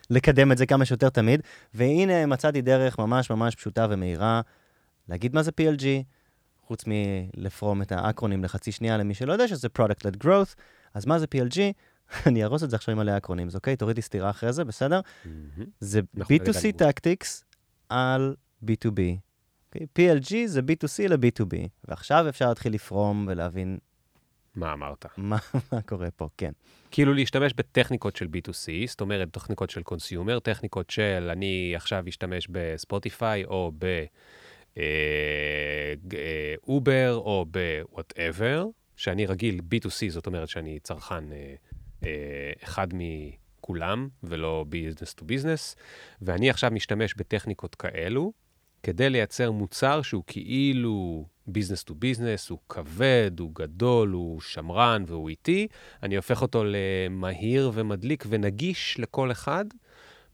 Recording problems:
none

